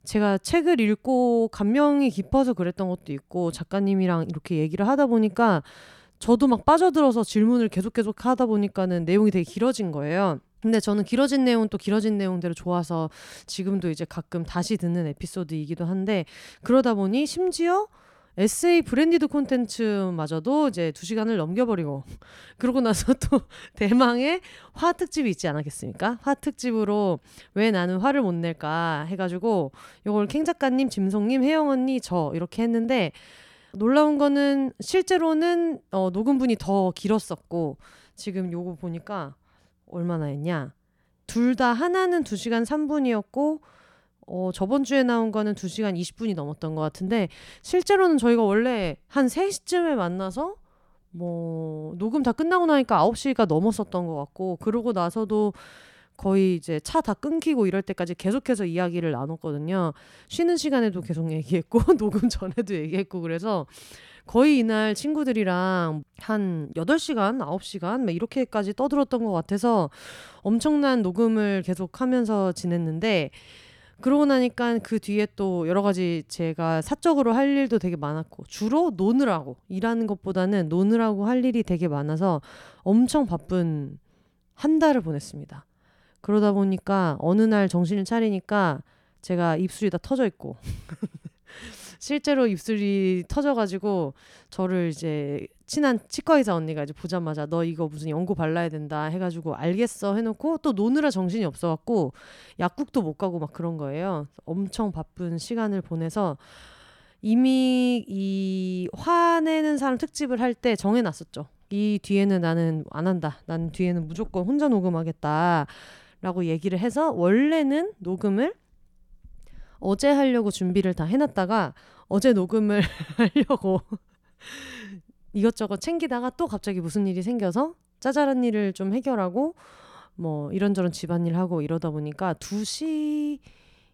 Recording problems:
none

